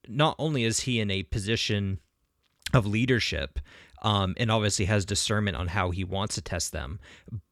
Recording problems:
none

